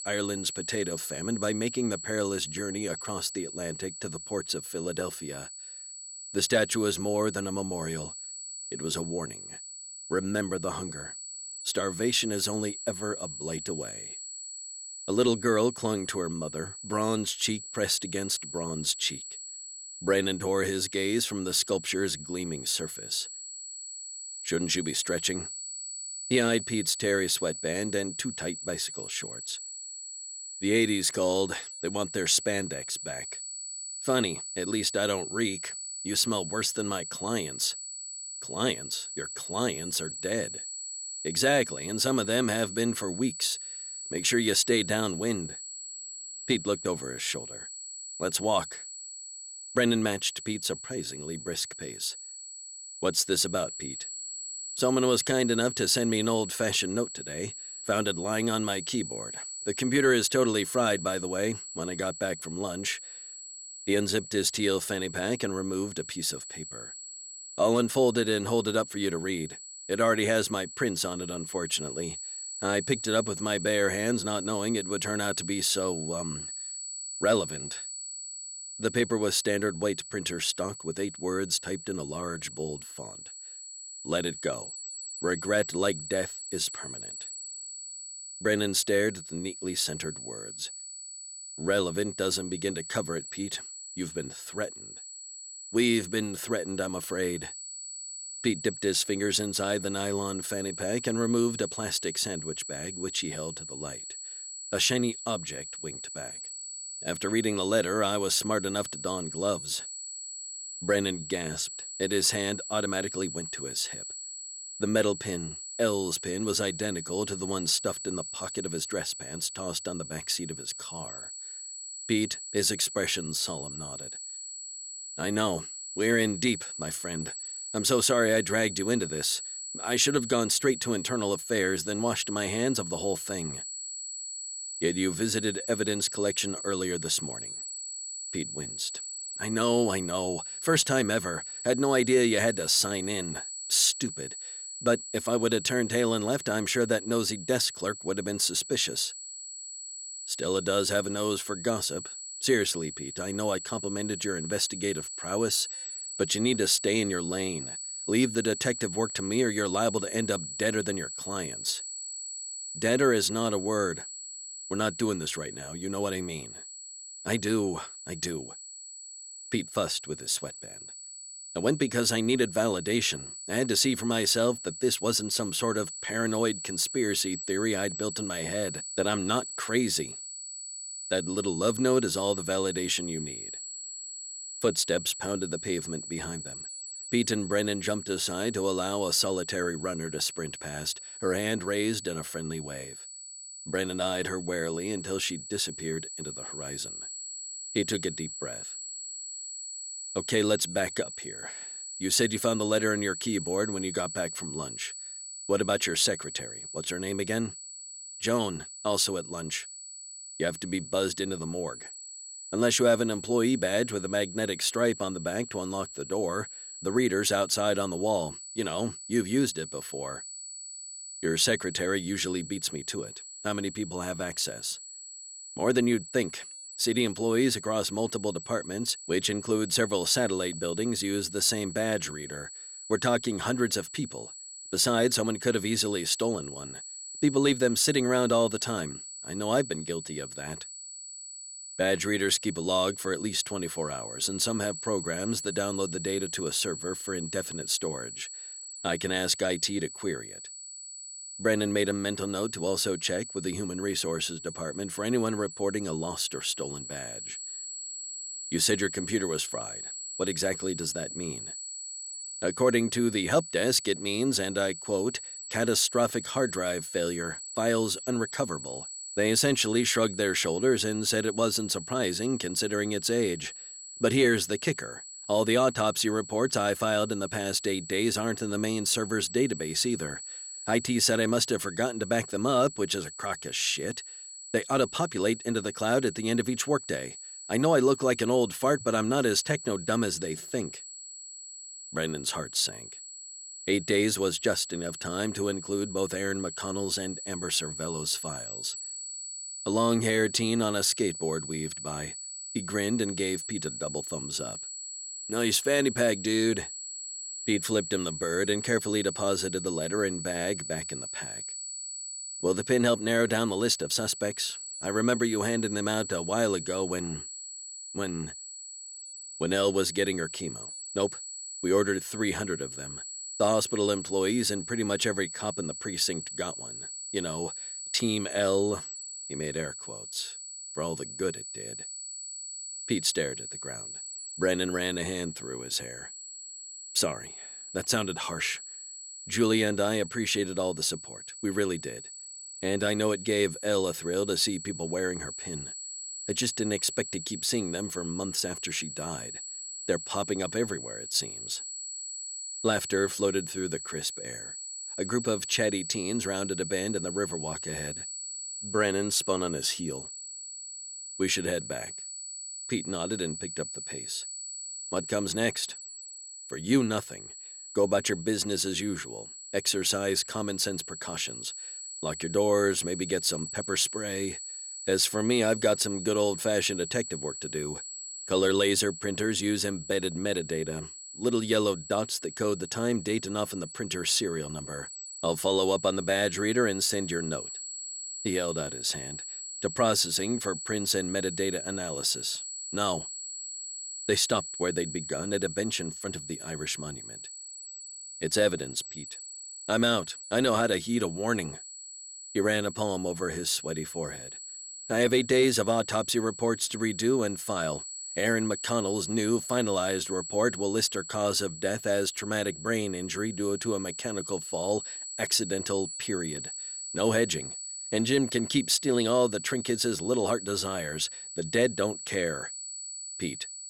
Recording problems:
high-pitched whine; loud; throughout; 7.5 kHz, 9 dB below the speech

